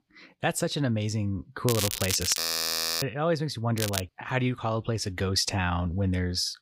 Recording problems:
crackling; loud; at 1.5 s and at 4 s; 2 dB below the speech
audio freezing; at 2.5 s for 0.5 s

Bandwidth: 15.5 kHz